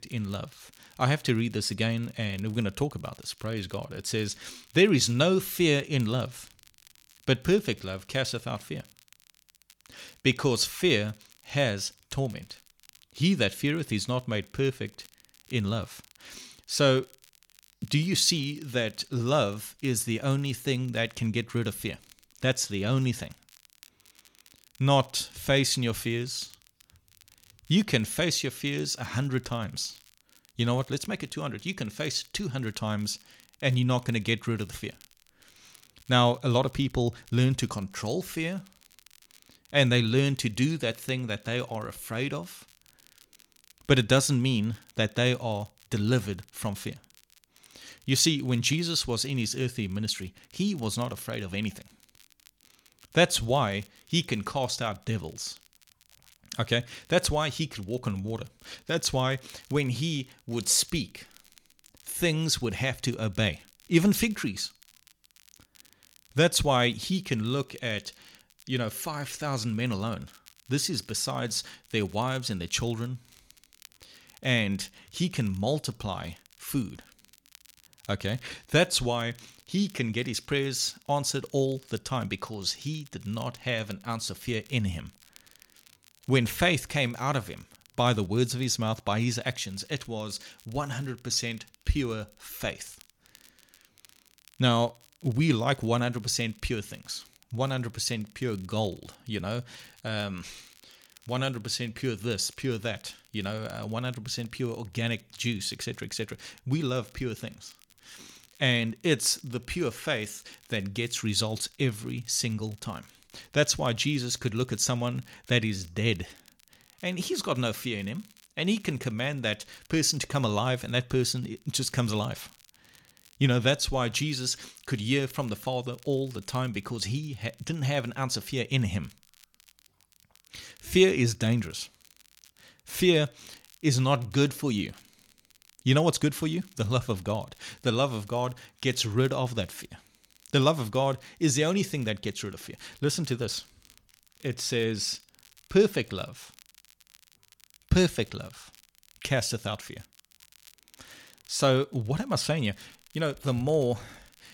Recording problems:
crackle, like an old record; faint; 30 dB below the speech

